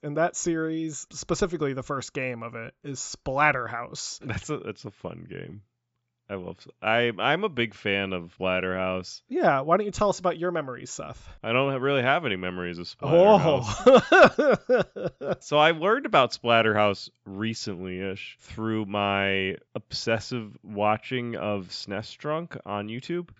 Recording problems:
high frequencies cut off; noticeable; nothing above 8 kHz

